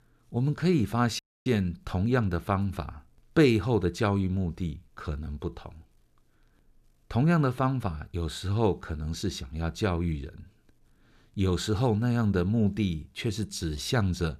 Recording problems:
audio cutting out; at 1 s

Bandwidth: 14.5 kHz